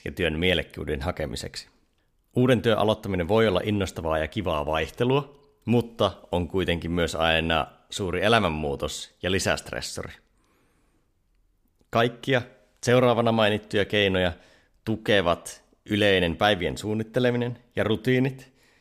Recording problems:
none

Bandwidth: 15 kHz